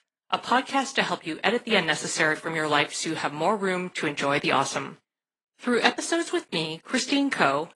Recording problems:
thin; somewhat; fading below 300 Hz
garbled, watery; slightly

